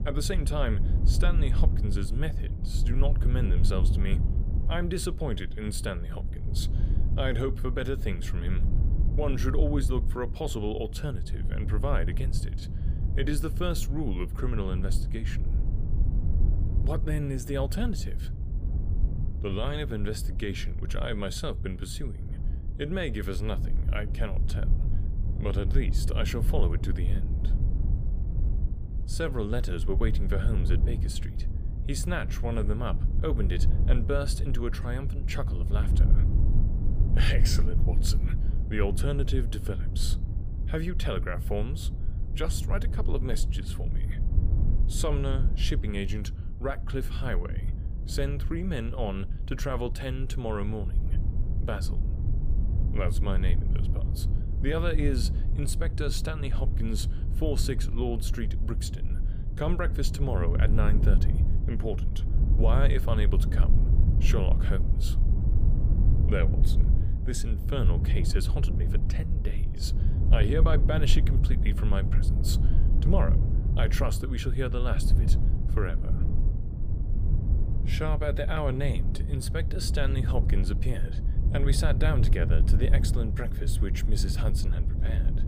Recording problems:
wind noise on the microphone; heavy; 8 dB below the speech

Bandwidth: 15 kHz